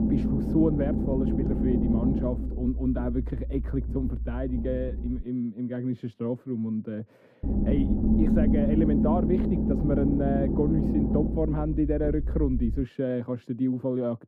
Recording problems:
muffled; very; fading above 1.5 kHz
low rumble; loud; until 5 s and from 7.5 to 13 s; 1 dB below the speech

